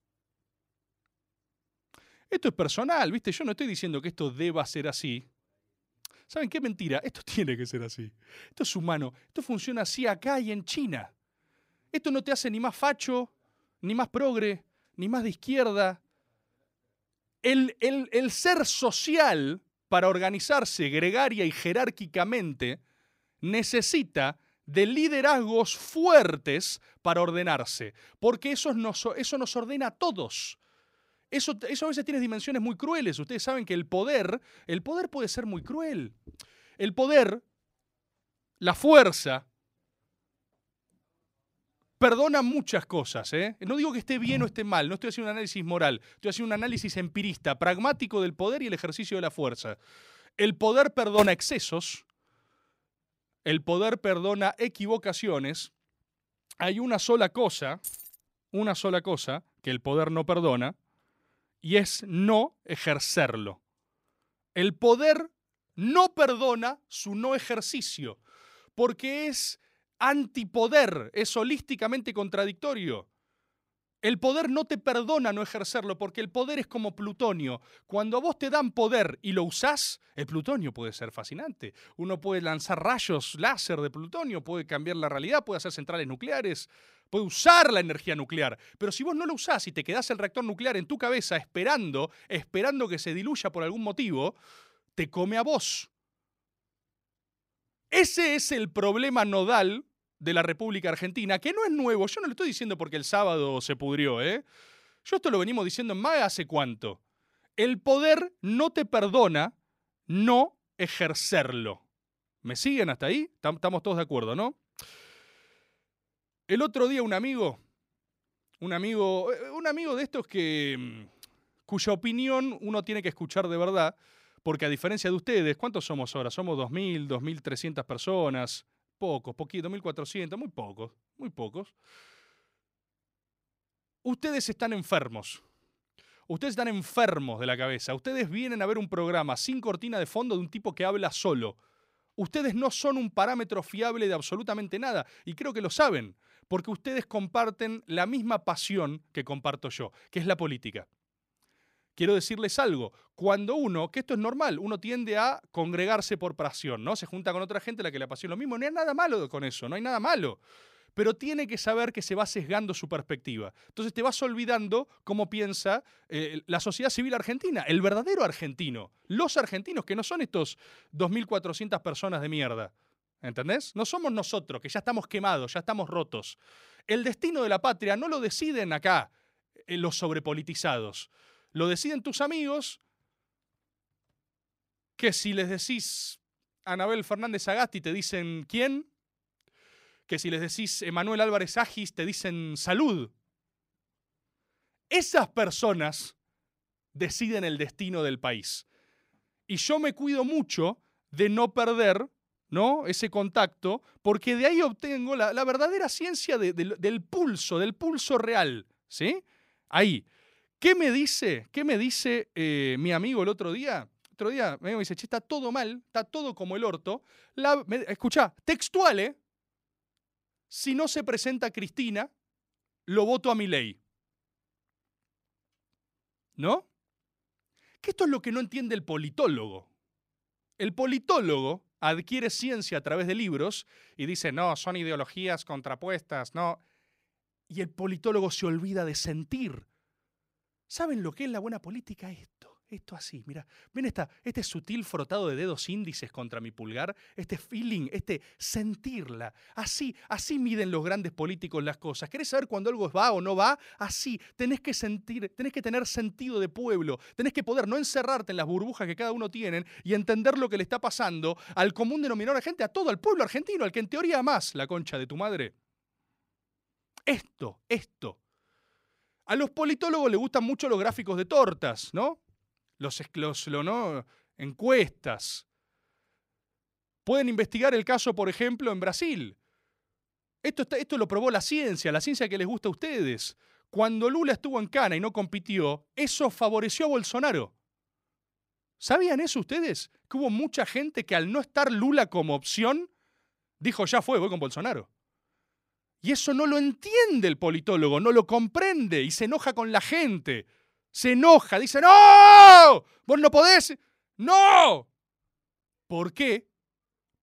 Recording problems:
uneven, jittery; strongly; from 9.5 s to 4:46
jangling keys; faint; at 58 s; peak 10 dB below the speech

